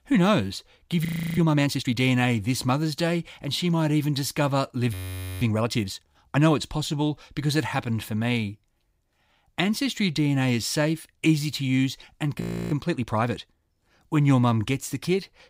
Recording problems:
audio freezing; at 1 s, at 5 s and at 12 s

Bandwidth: 15.5 kHz